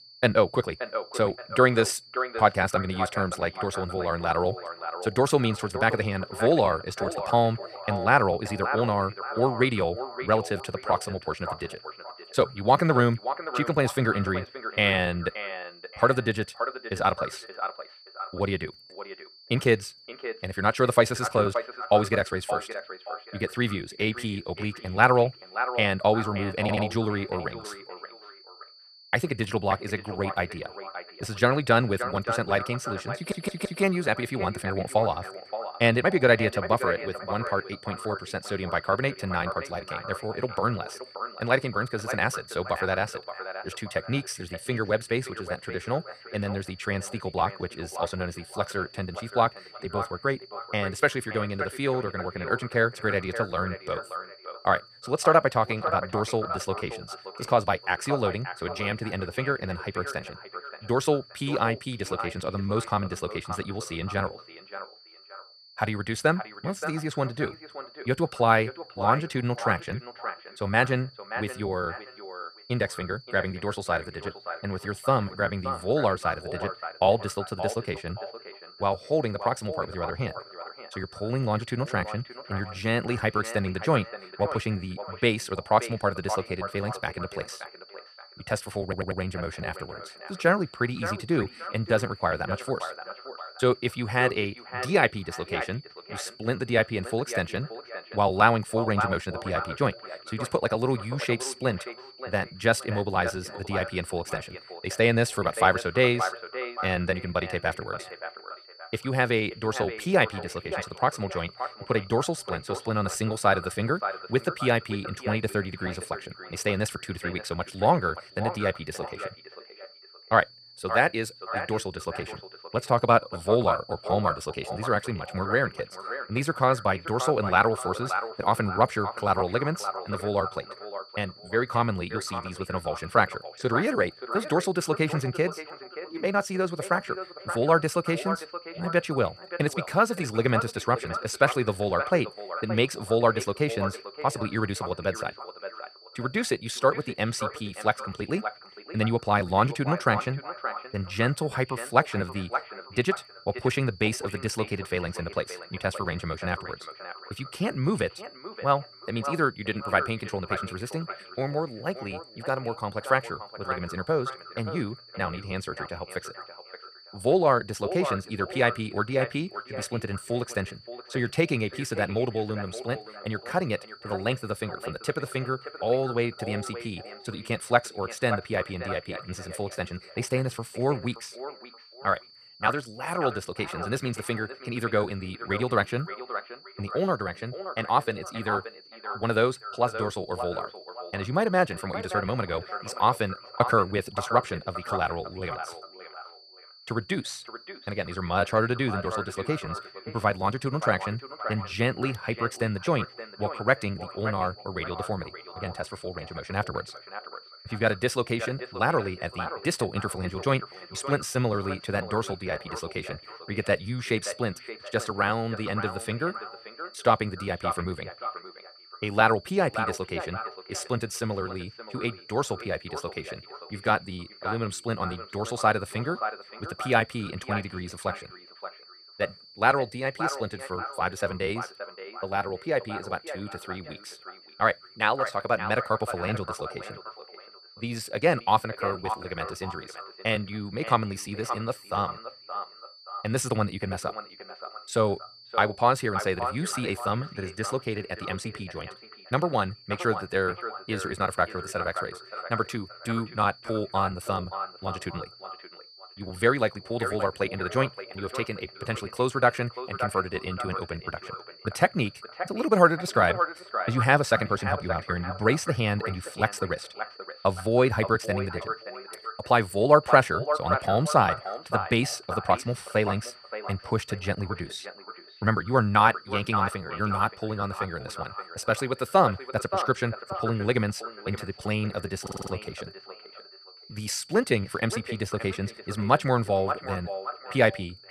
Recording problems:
echo of what is said; strong; throughout; 580 ms later, 10 dB below the speech
wrong speed, natural pitch; too fast; 1.5 times normal speed
high-pitched whine; faint; throughout; 4.5 kHz, 20 dB below the speech
audio stuttering; 4 times, first at 27 s

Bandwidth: 14.5 kHz